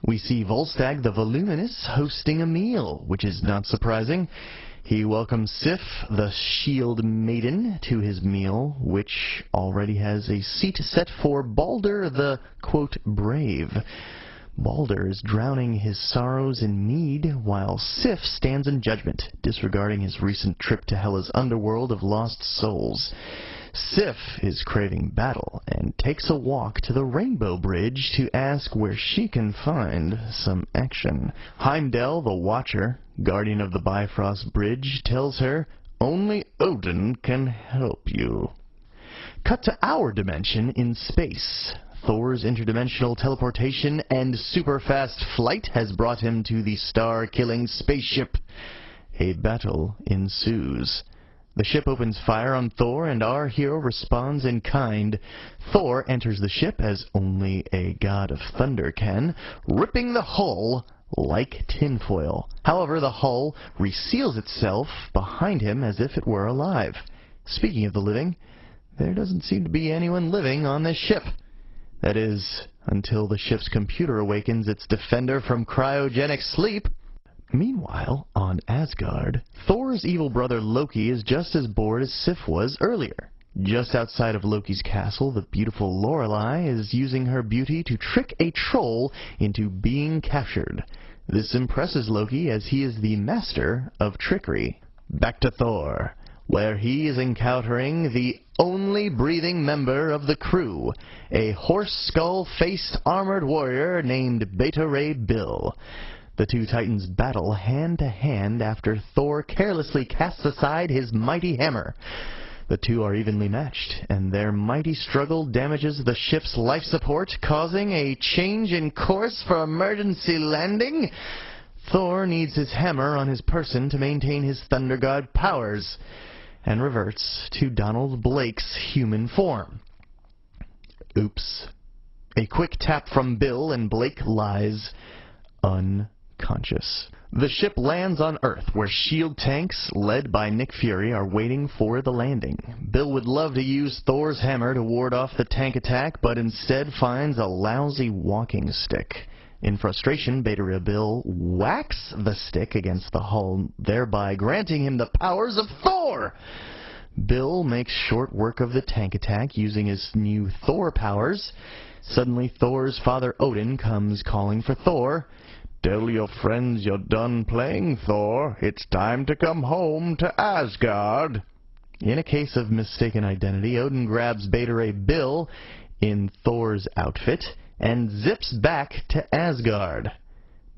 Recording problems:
garbled, watery; badly; nothing above 5.5 kHz
squashed, flat; somewhat

